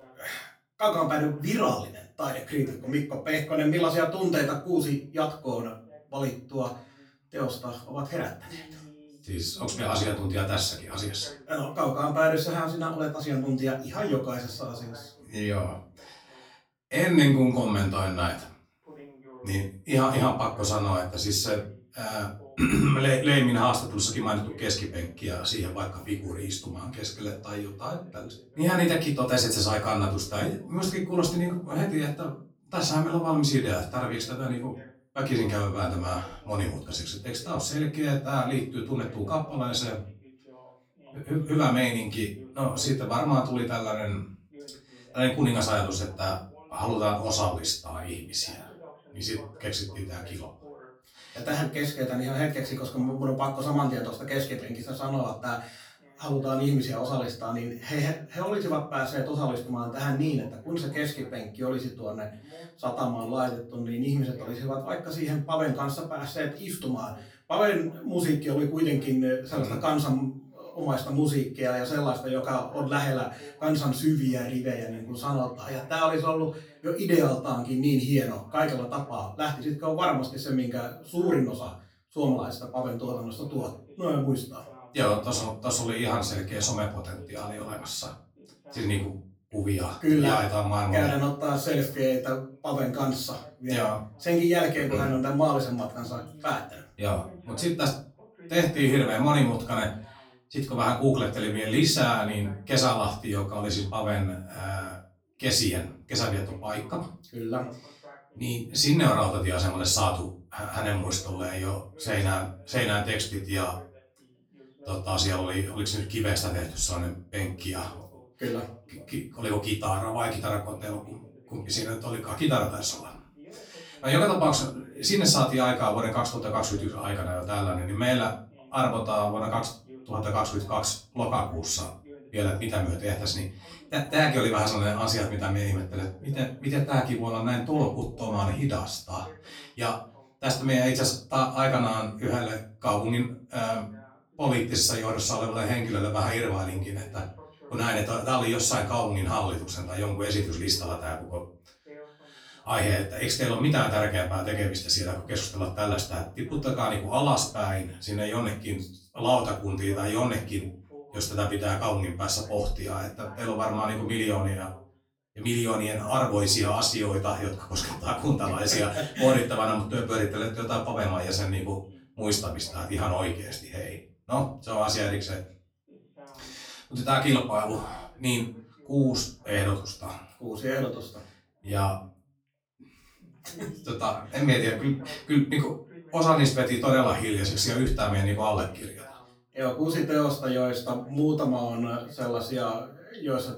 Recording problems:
off-mic speech; far
room echo; slight; dies away in 0.3 s
voice in the background; faint; throughout; 25 dB below the speech

